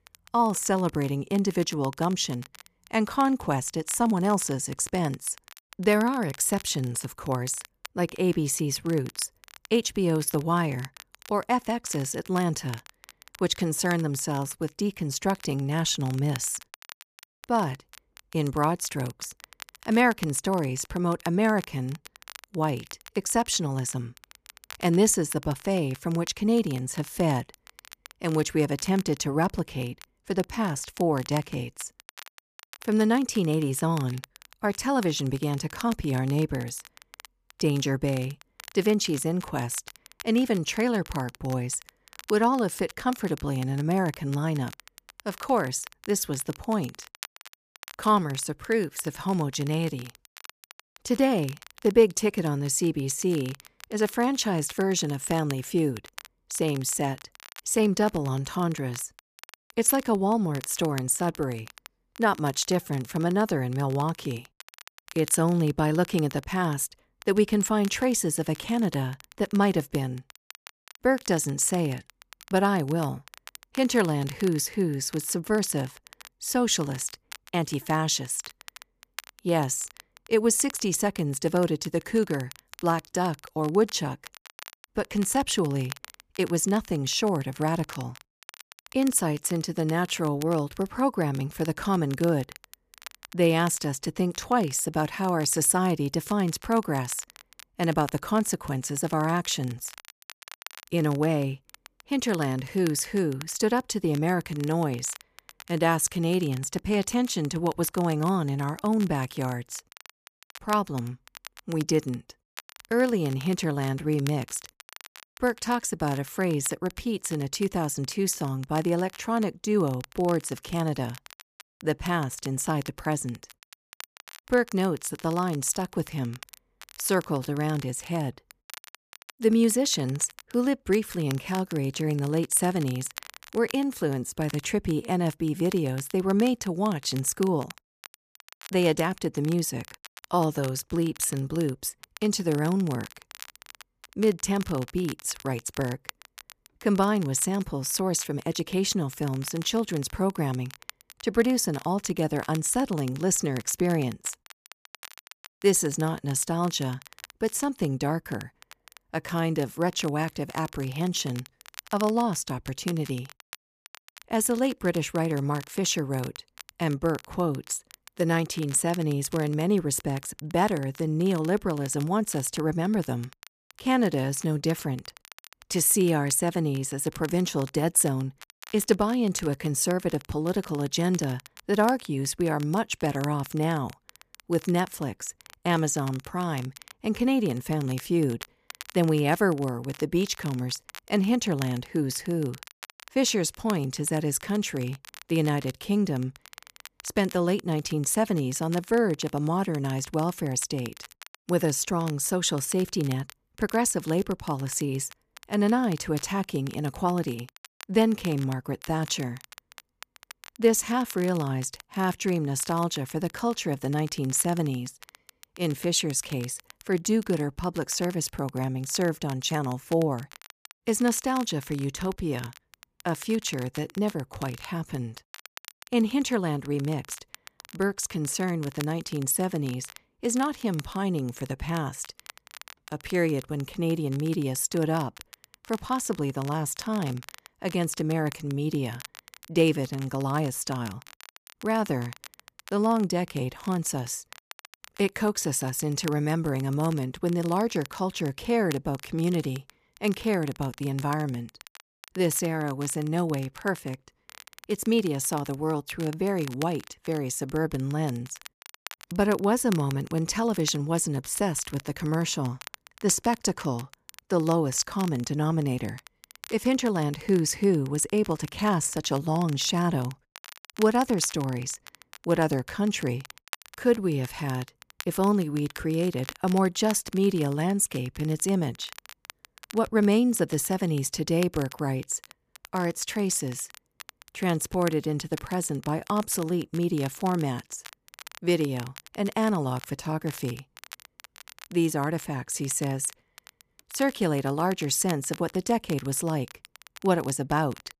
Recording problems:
crackle, like an old record; noticeable; 20 dB below the speech

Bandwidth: 14.5 kHz